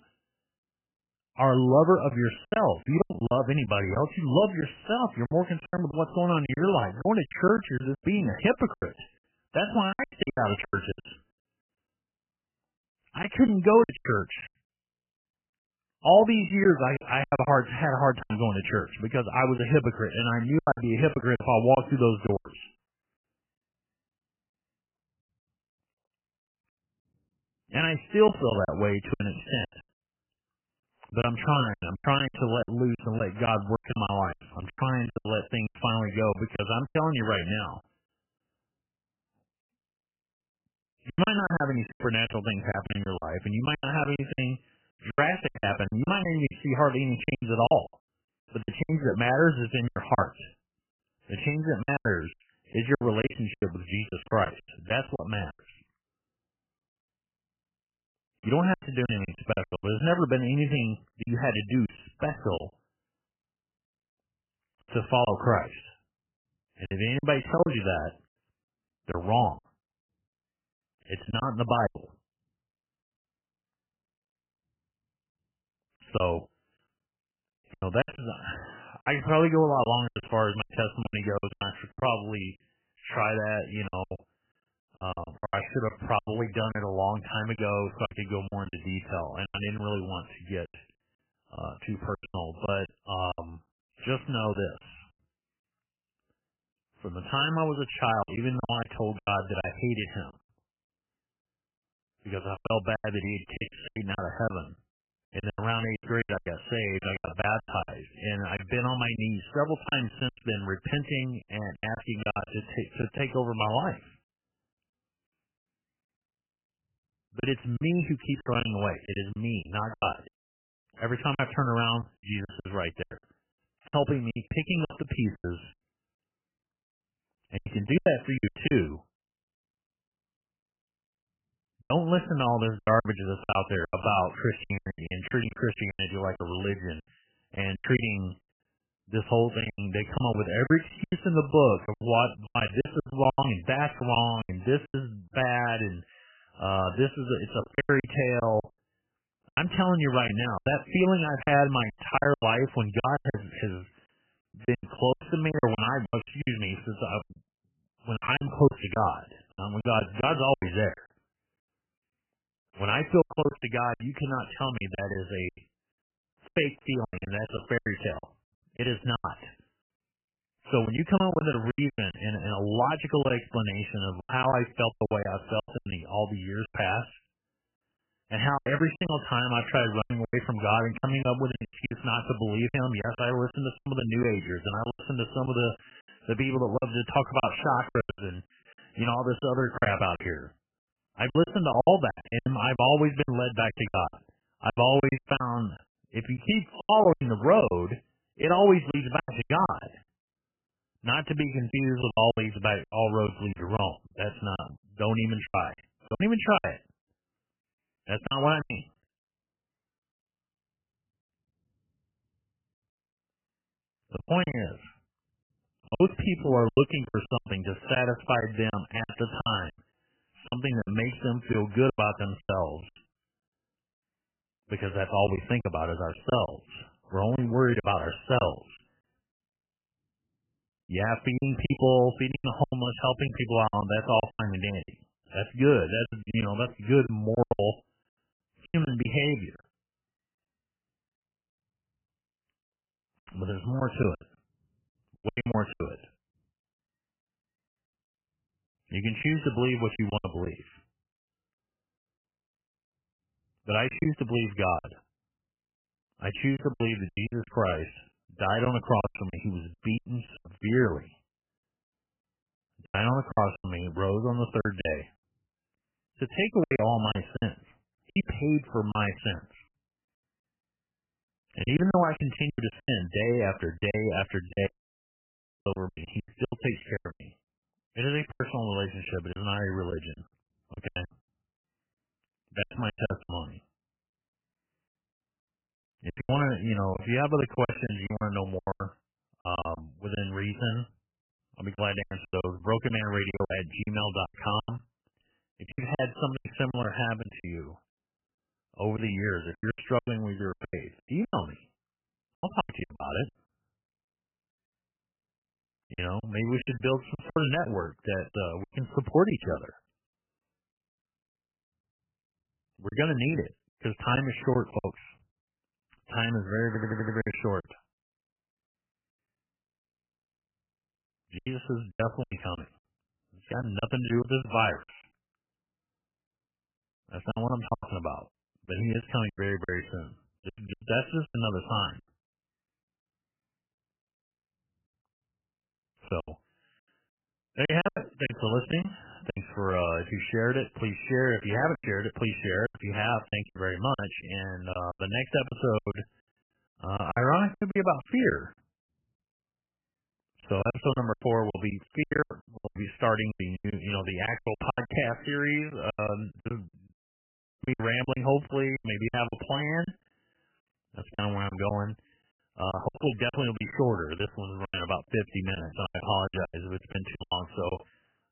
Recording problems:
garbled, watery; badly; nothing above 3 kHz
high-pitched whine; very faint; until 4:11; 3 kHz, 85 dB below the speech
choppy; very; 14% of the speech affected
audio cutting out; at 2:00 for 0.5 s, at 4:35 for 1 s and at 5:57 for 0.5 s
audio stuttering; at 5:17

